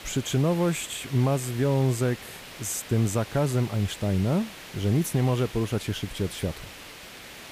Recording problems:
hiss; noticeable; throughout; 15 dB below the speech

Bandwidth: 15 kHz